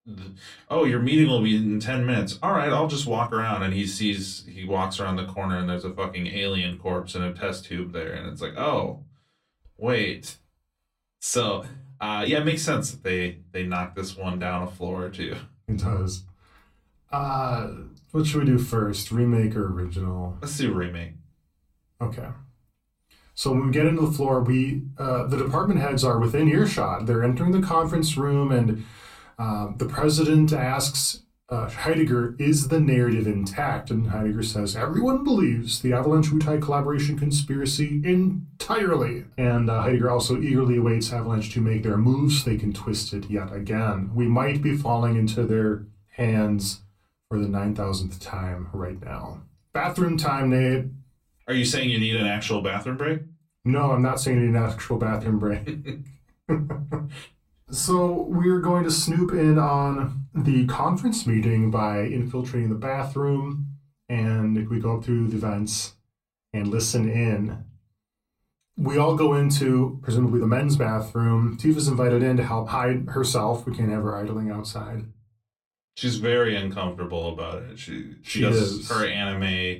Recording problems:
off-mic speech; far
room echo; very slight; dies away in 0.2 s
uneven, jittery; strongly; from 3 s to 1:19

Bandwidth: 16.5 kHz